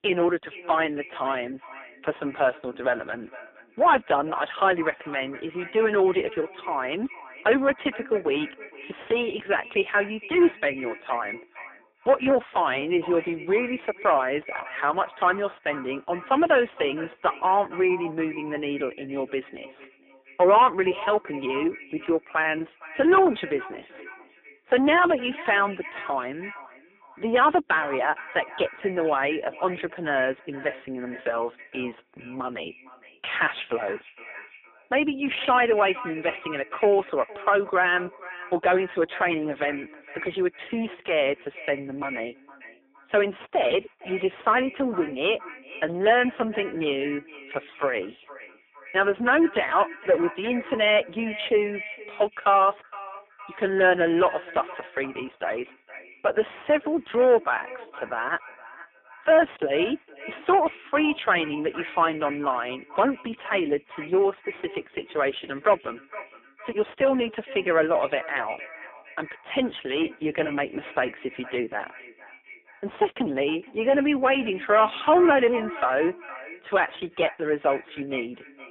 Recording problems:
phone-call audio; poor line; nothing above 3.5 kHz
distortion; heavy; 8 dB below the speech
echo of what is said; noticeable; throughout; 460 ms later, 15 dB below the speech

